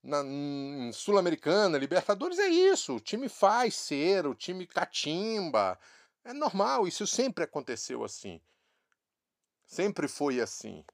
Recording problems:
none

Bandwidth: 15 kHz